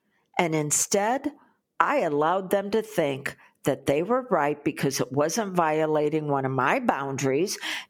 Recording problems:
squashed, flat; somewhat

